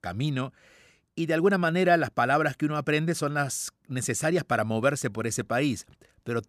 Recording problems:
none

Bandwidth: 14 kHz